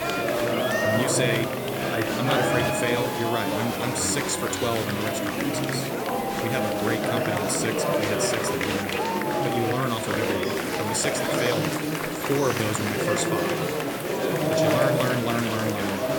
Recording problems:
murmuring crowd; very loud; throughout; 3 dB above the speech
hiss; noticeable; throughout; 10 dB below the speech
traffic noise; very faint; throughout; 25 dB below the speech

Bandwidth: 18 kHz